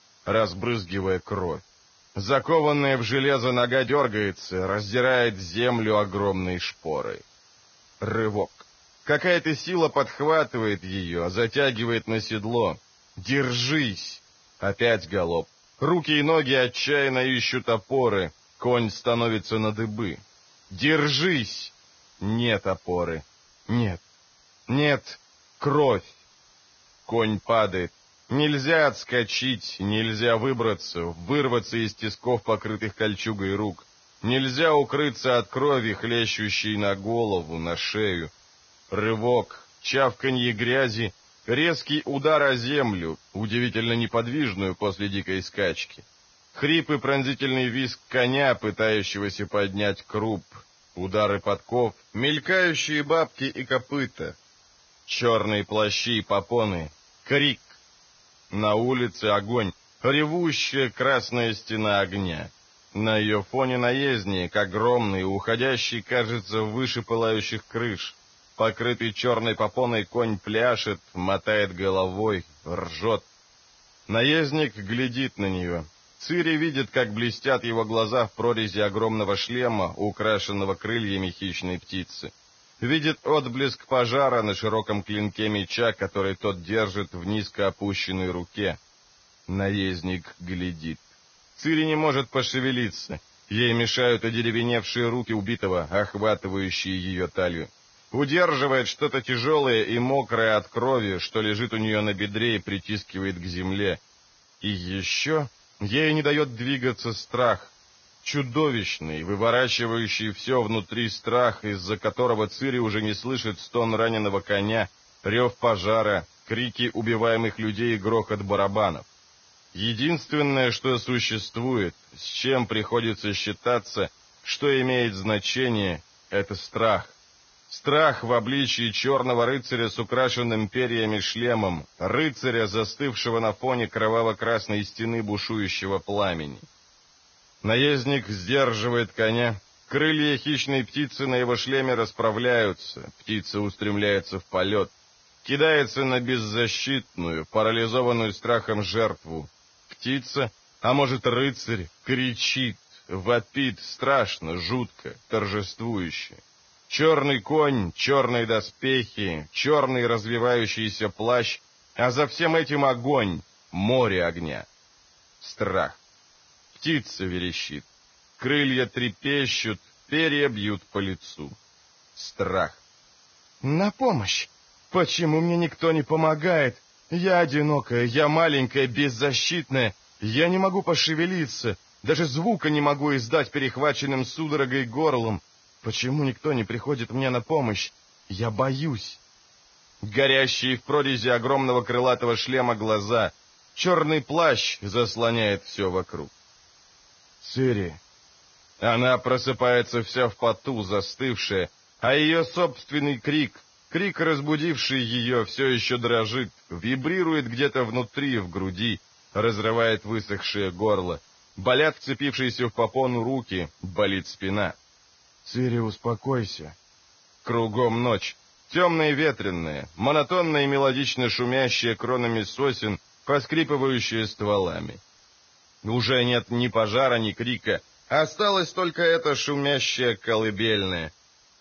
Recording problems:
garbled, watery; badly; nothing above 6.5 kHz
hiss; faint; throughout; 30 dB below the speech
uneven, jittery; strongly; from 3.5 s to 3:39

